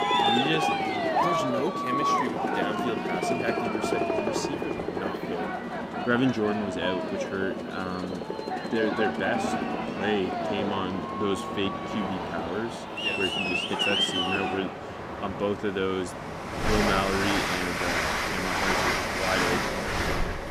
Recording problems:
train or aircraft noise; very loud; throughout; 3 dB above the speech

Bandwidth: 15.5 kHz